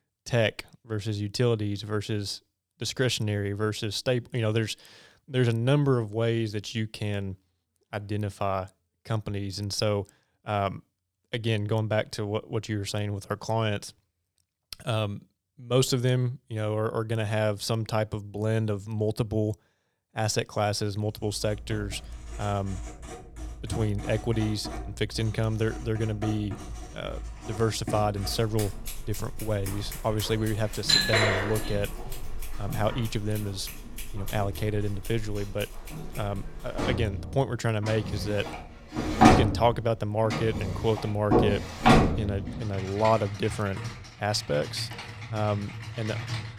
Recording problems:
household noises; loud; from 21 s on; 2 dB below the speech

